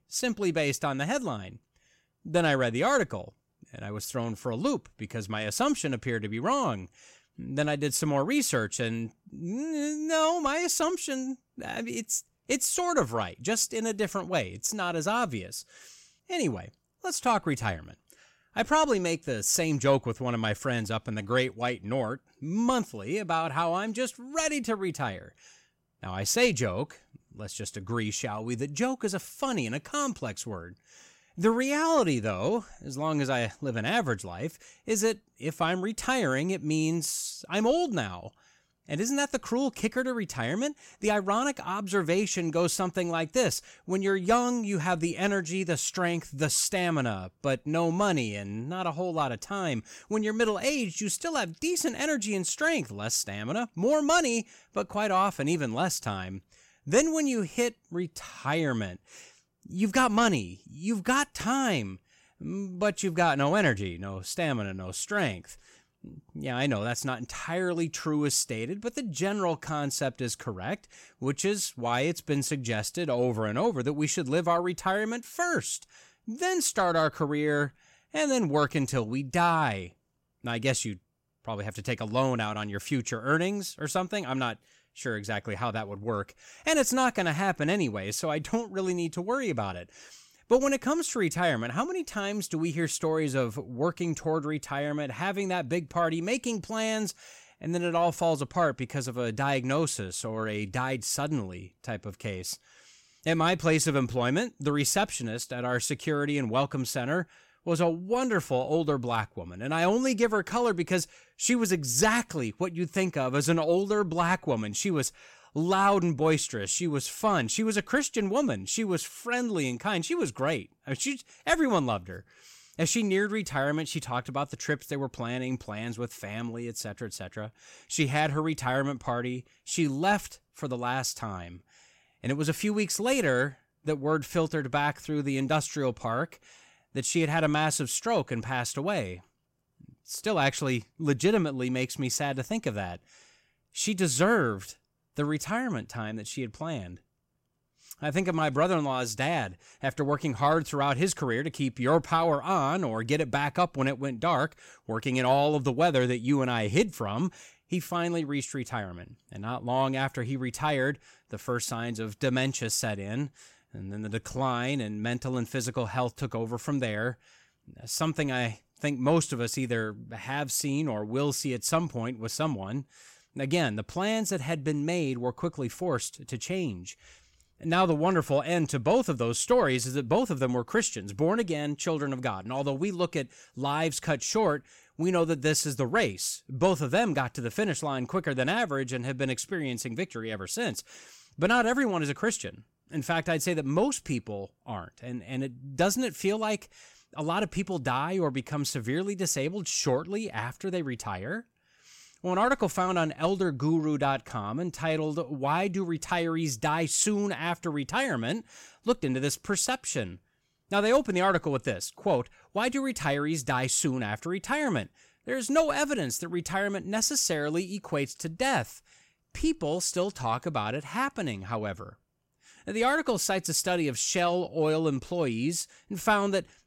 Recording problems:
none

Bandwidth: 16 kHz